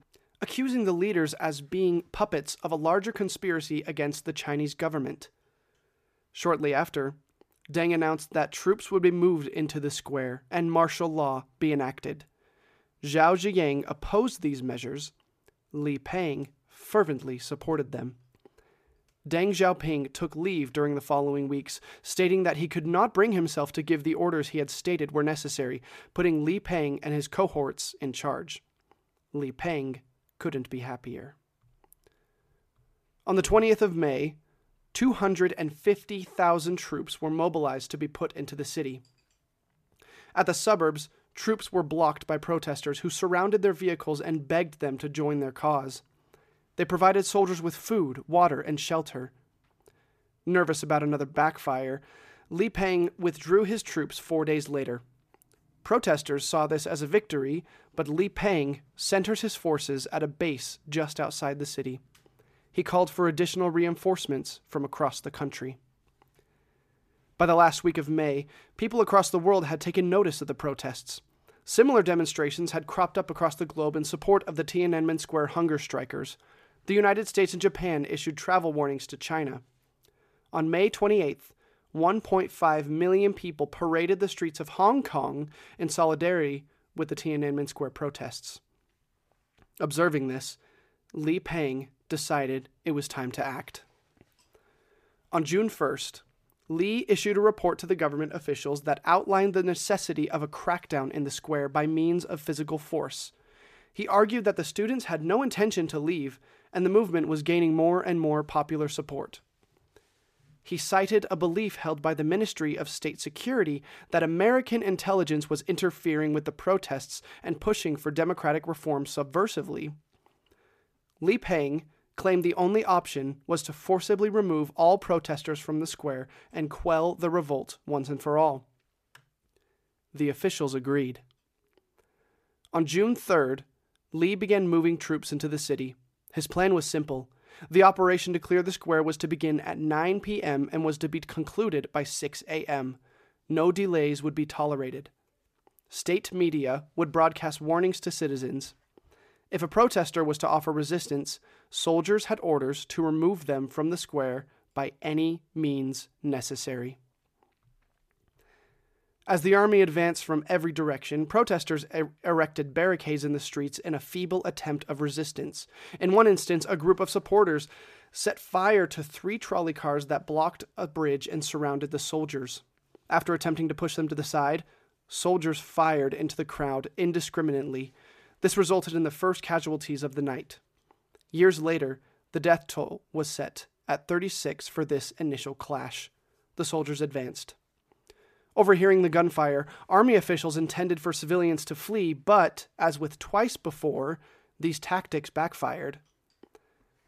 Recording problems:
none

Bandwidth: 14.5 kHz